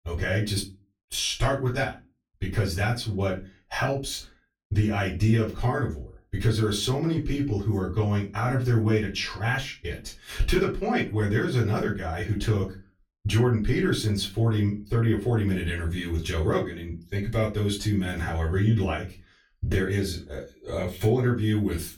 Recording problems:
off-mic speech; far
room echo; very slight; dies away in 0.2 s

